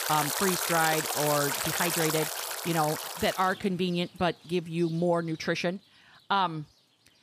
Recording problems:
rain or running water; loud; throughout; 1 dB below the speech

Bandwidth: 15 kHz